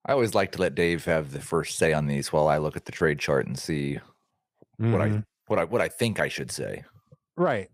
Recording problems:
none

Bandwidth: 15 kHz